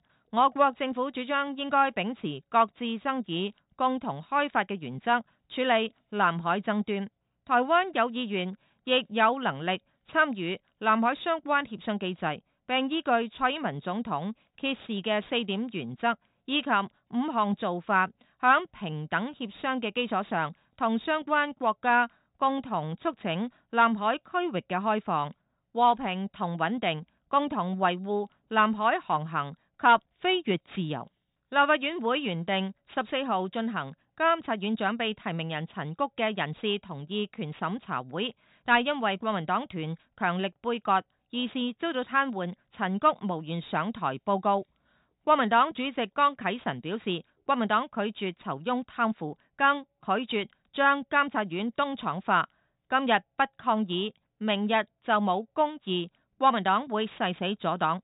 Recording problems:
high frequencies cut off; severe; nothing above 4 kHz

